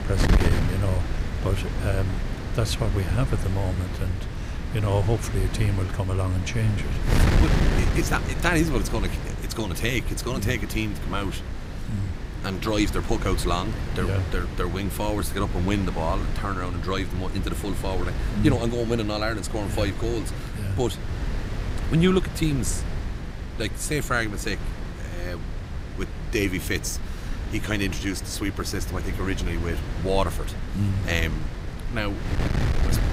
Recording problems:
wind noise on the microphone; heavy; 7 dB below the speech

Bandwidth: 15.5 kHz